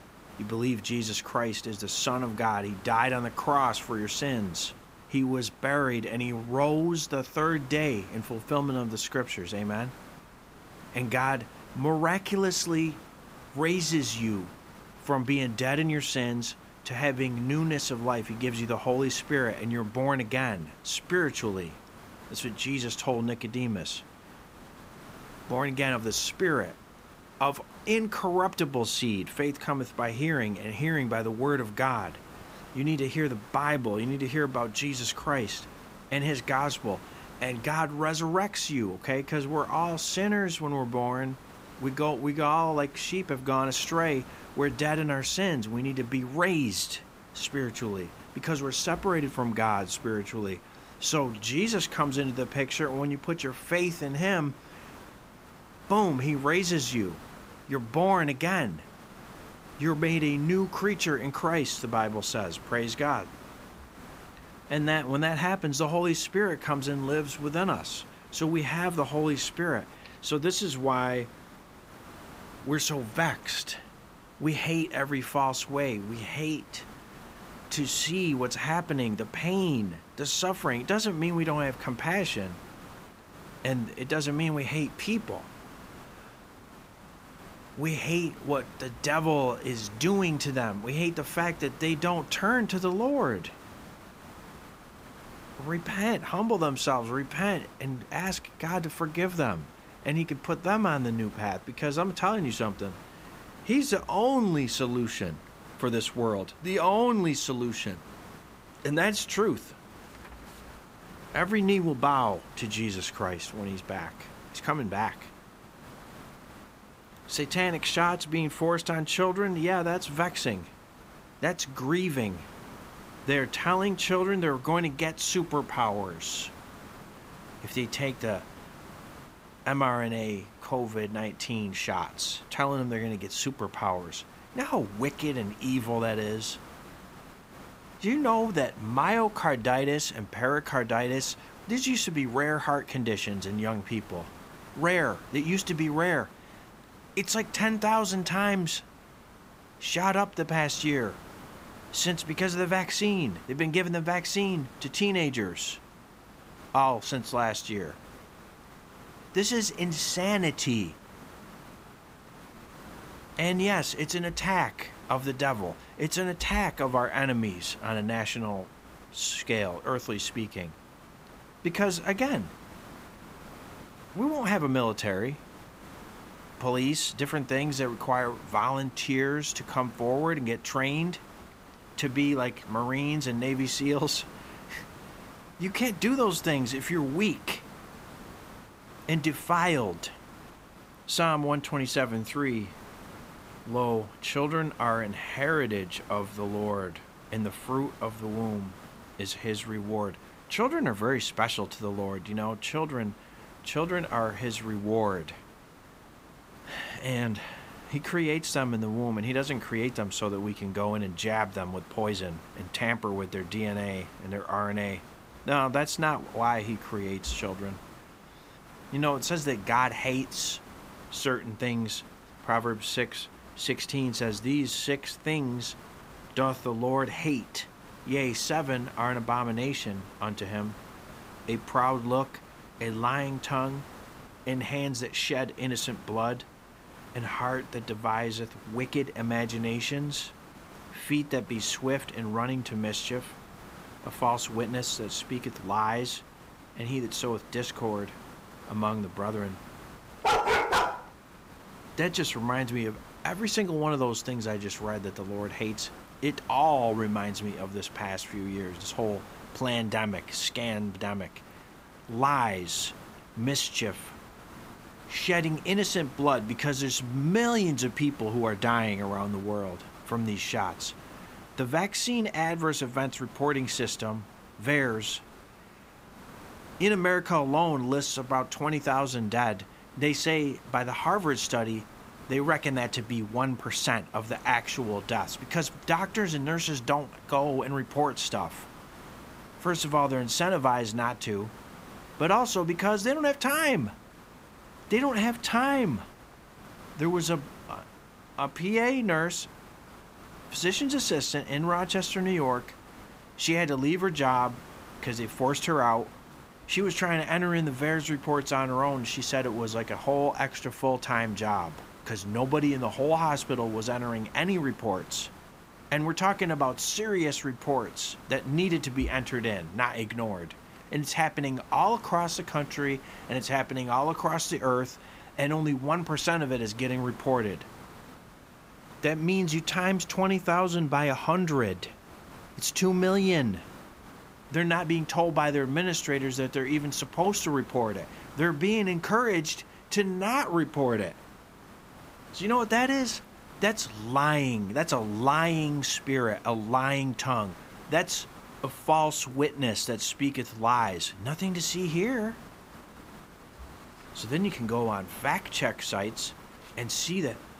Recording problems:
hiss; noticeable; throughout; 20 dB below the speech
dog barking; loud; at 4:10; peak 5 dB above the speech

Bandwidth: 15.5 kHz